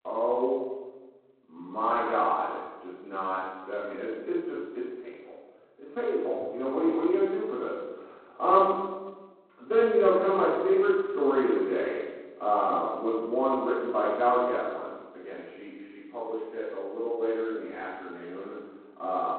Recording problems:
phone-call audio; poor line; nothing above 4 kHz
off-mic speech; far
room echo; noticeable; dies away in 1.2 s
muffled; very slightly; fading above 2 kHz

